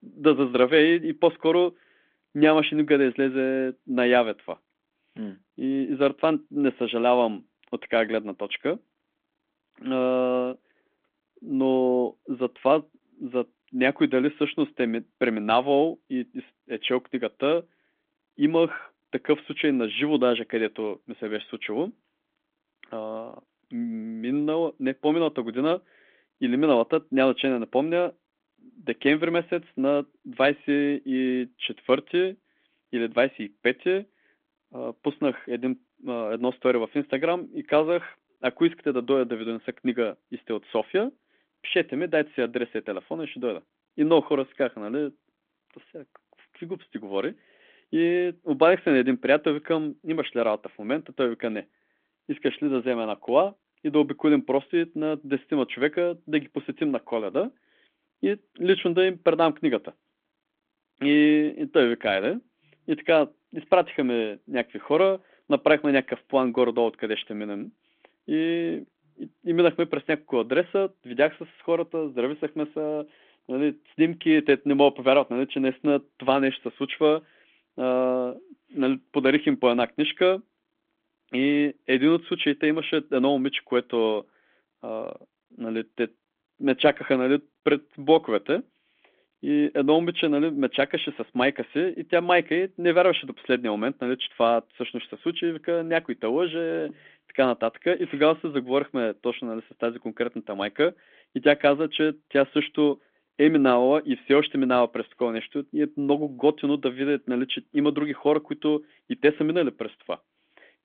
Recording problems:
phone-call audio; nothing above 3.5 kHz

